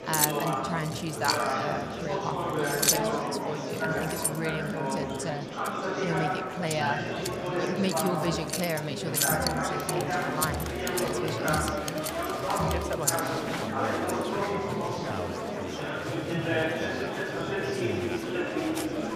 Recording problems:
household noises; very loud; throughout; 3 dB above the speech
murmuring crowd; very loud; throughout; 4 dB above the speech

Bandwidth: 15 kHz